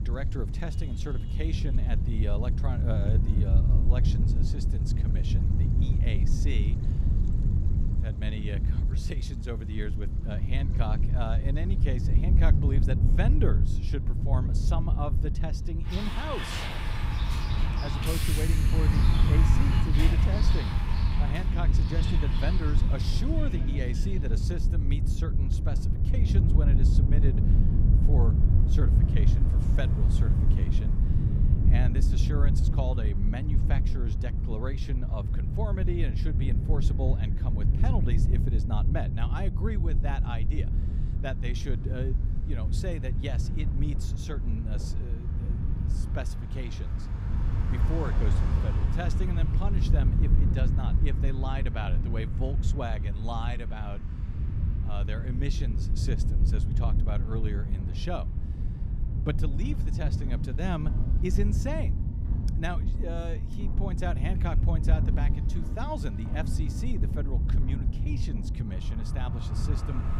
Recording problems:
wind noise on the microphone; heavy; 3 dB below the speech
traffic noise; loud; throughout; 3 dB below the speech
rain or running water; faint; throughout; 25 dB below the speech

